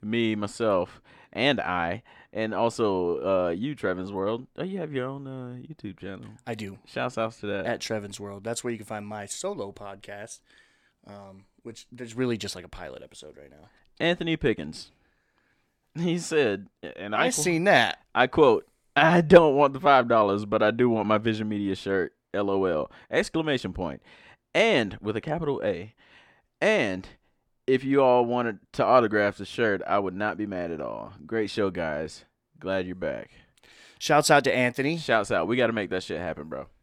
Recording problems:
none

